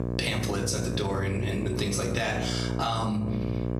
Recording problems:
room echo; slight; dies away in 0.6 s
off-mic speech; somewhat distant
squashed, flat; somewhat
electrical hum; loud; throughout; 60 Hz, 8 dB below the speech

